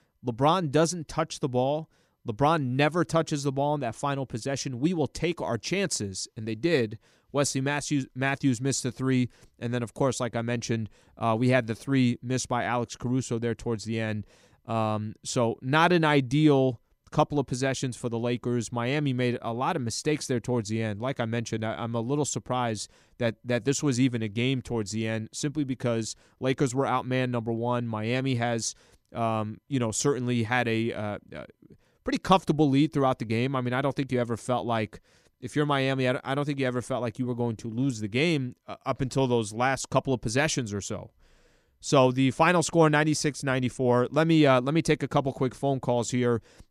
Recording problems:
none

